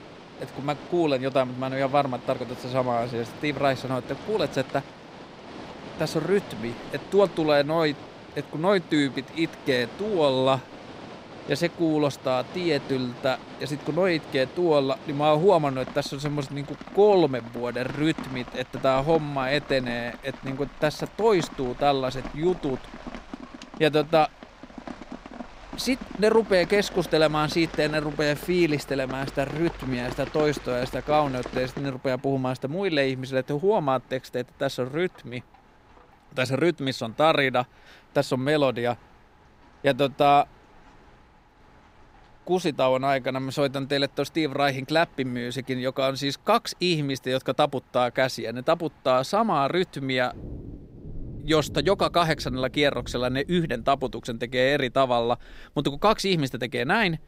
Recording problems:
rain or running water; noticeable; throughout; 15 dB below the speech

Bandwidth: 15.5 kHz